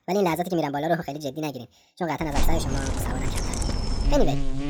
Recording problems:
wrong speed and pitch; too fast and too high; 1.5 times normal speed
animal sounds; loud; from 2.5 s on; 1 dB below the speech

